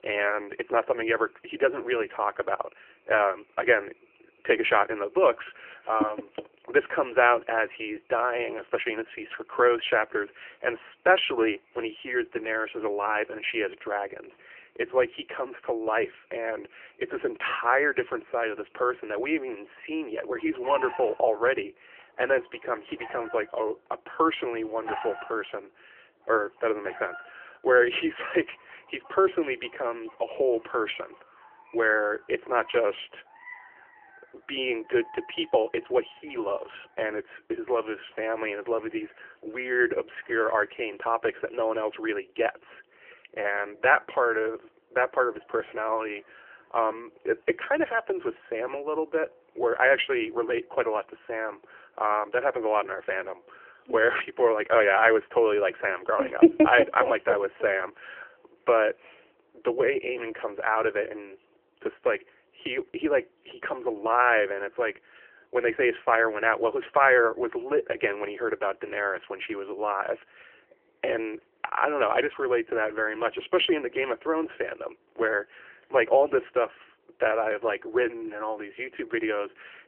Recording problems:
phone-call audio; nothing above 3 kHz
animal sounds; faint; throughout; 20 dB below the speech

